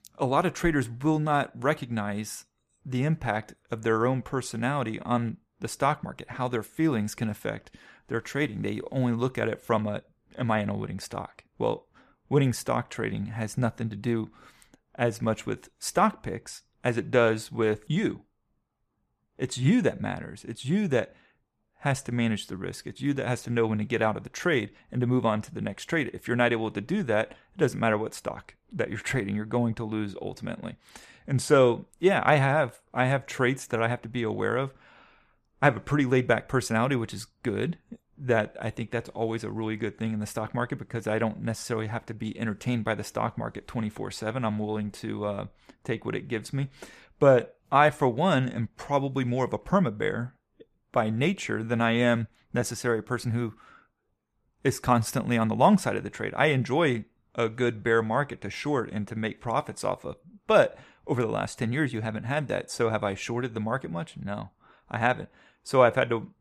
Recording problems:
none

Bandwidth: 14.5 kHz